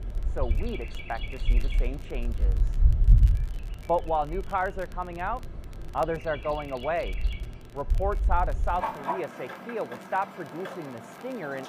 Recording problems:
muffled; very; fading above 3 kHz
animal sounds; very loud; throughout; 2 dB above the speech
crackle, like an old record; faint; 25 dB below the speech

